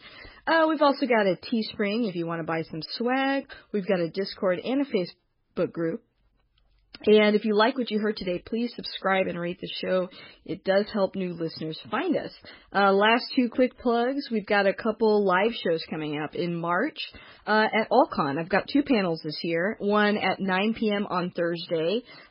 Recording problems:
garbled, watery; badly; nothing above 5 kHz

